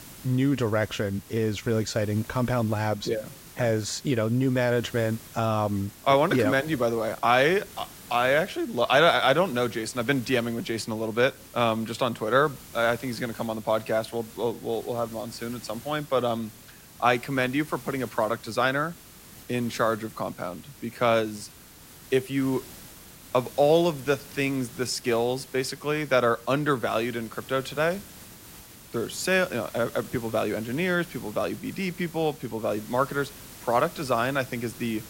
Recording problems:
hiss; noticeable; throughout; 20 dB below the speech

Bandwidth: 16 kHz